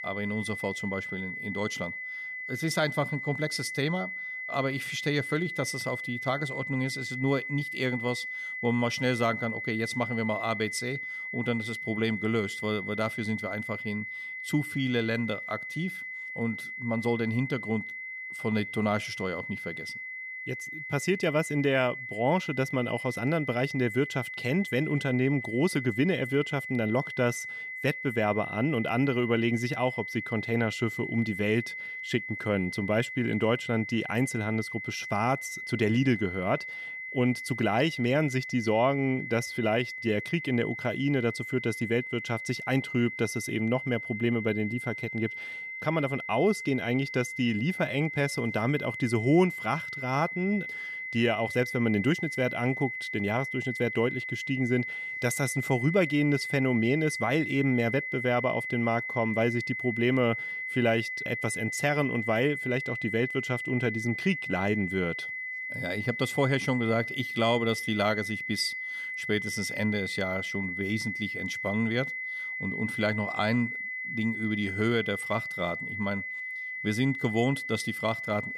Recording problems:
high-pitched whine; loud; throughout; 2 kHz, 5 dB below the speech

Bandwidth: 14.5 kHz